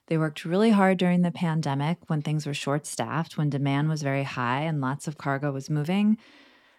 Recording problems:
none

